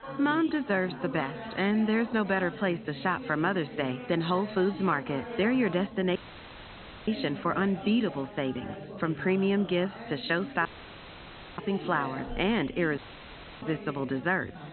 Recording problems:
high frequencies cut off; severe; nothing above 4 kHz
chatter from many people; noticeable; throughout; 10 dB below the speech
audio cutting out; at 6 s for 1 s, at 11 s for 1 s and at 13 s for 0.5 s

